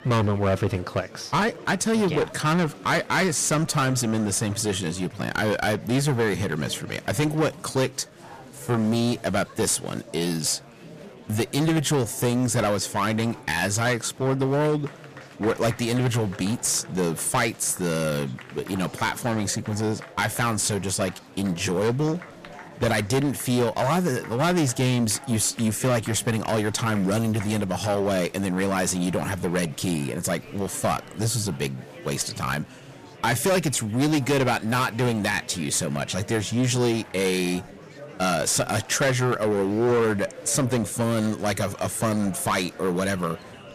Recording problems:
distortion; heavy; 12% of the sound clipped
murmuring crowd; noticeable; throughout; 20 dB below the speech

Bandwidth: 14.5 kHz